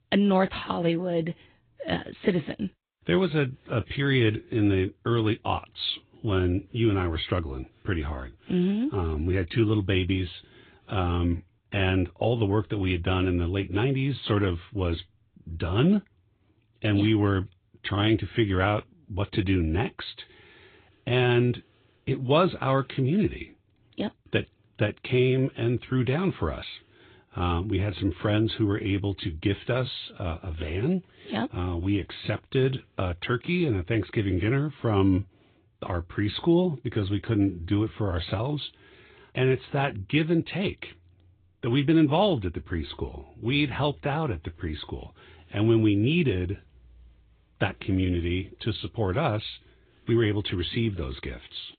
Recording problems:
high frequencies cut off; severe; nothing above 4 kHz
garbled, watery; slightly

